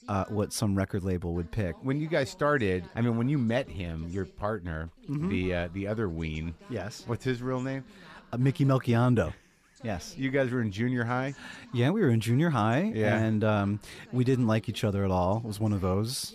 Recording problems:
voice in the background; faint; throughout; 25 dB below the speech

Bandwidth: 14.5 kHz